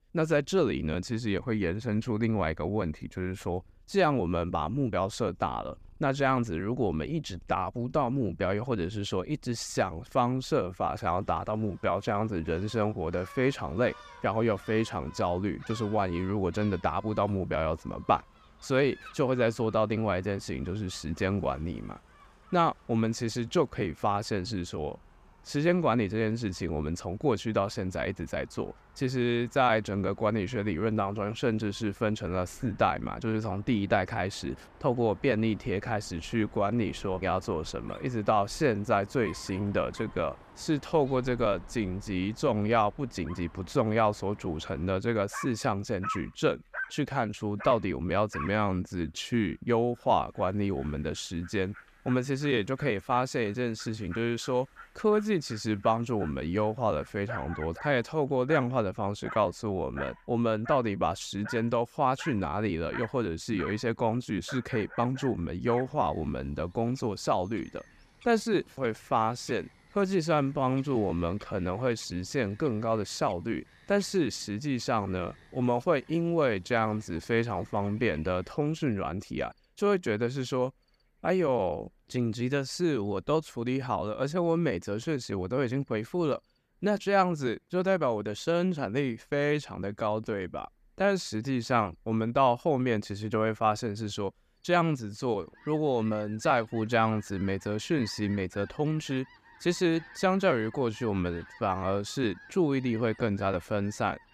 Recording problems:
animal sounds; noticeable; throughout; 20 dB below the speech

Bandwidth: 14.5 kHz